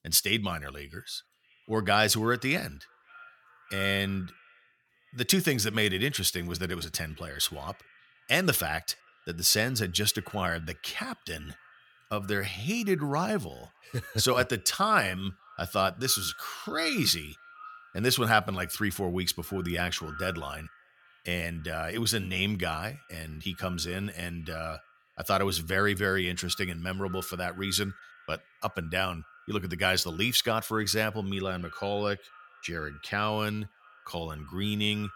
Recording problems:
echo of what is said; faint; throughout; 590 ms later, 20 dB below the speech

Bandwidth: 17 kHz